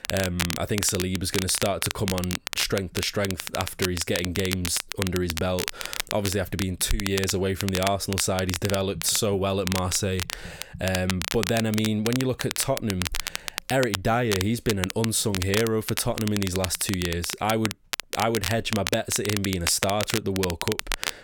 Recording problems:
crackle, like an old record; loud; 5 dB below the speech

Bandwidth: 17.5 kHz